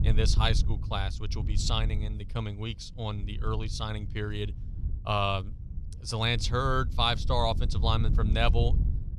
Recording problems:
wind noise on the microphone; occasional gusts; 15 dB below the speech

